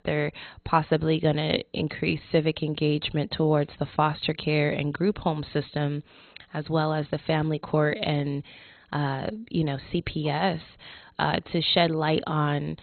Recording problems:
garbled, watery; badly; nothing above 4 kHz

